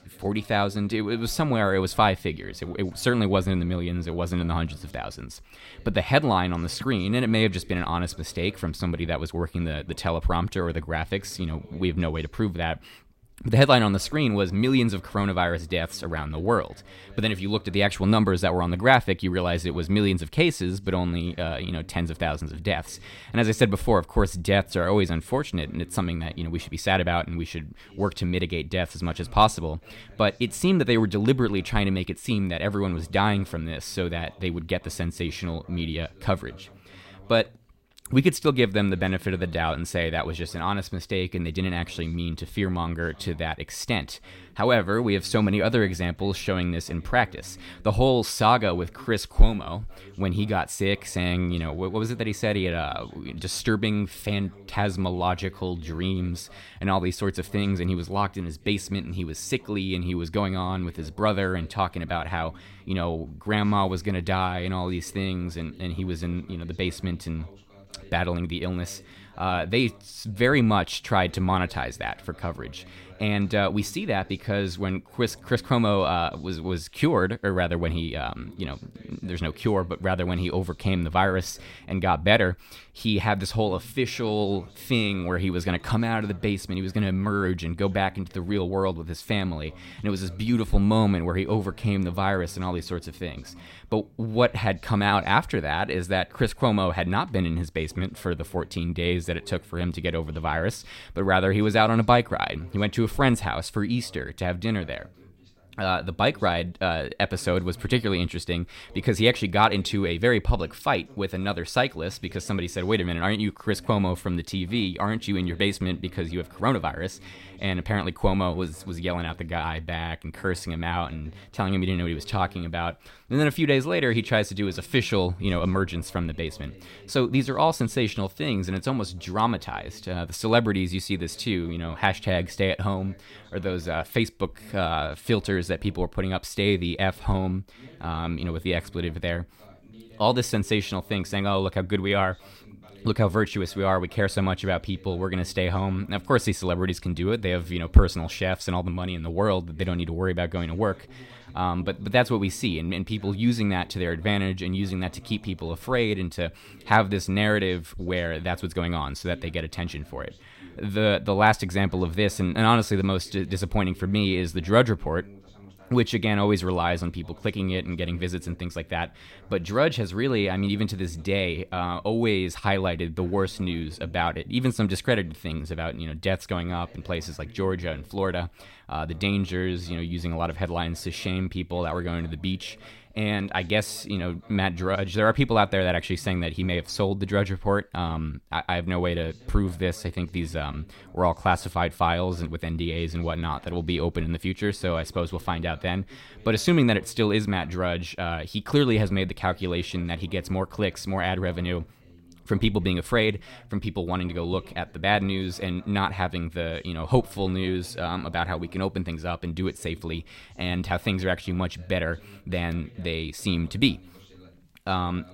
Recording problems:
voice in the background; faint; throughout; 25 dB below the speech

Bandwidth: 16 kHz